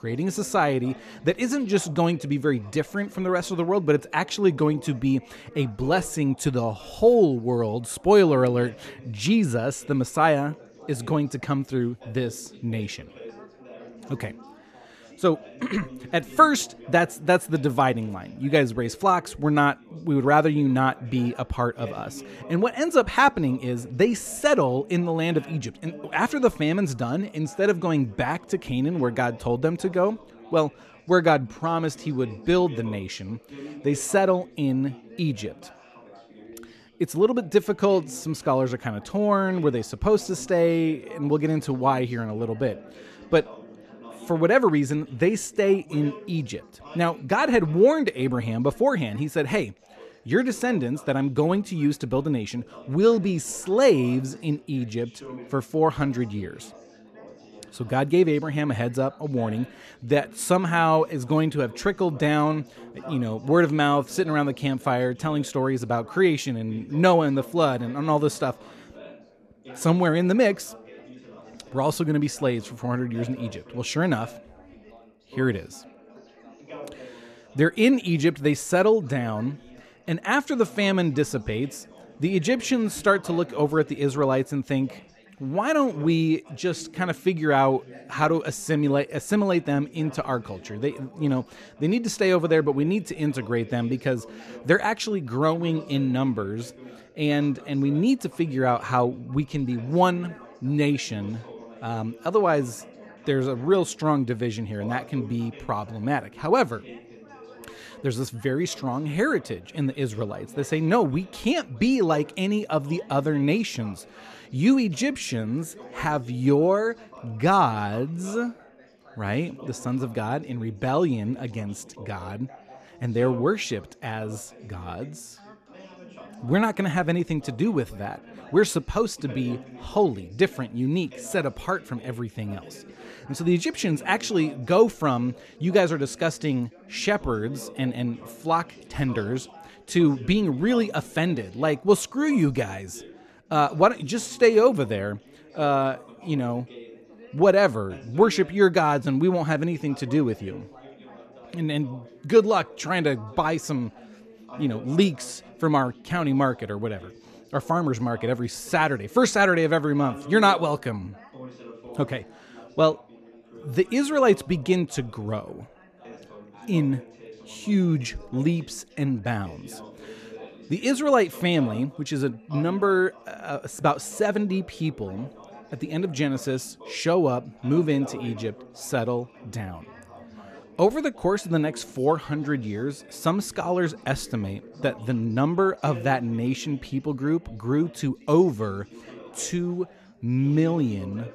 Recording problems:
background chatter; faint; throughout; 4 voices, 20 dB below the speech

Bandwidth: 14 kHz